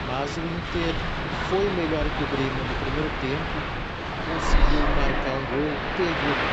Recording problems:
train or aircraft noise; very loud; throughout; 2 dB above the speech

